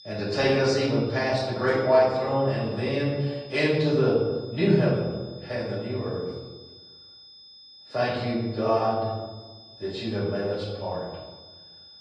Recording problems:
off-mic speech; far
room echo; noticeable; dies away in 1.1 s
garbled, watery; slightly
high-pitched whine; faint; throughout; 5 kHz, 20 dB below the speech

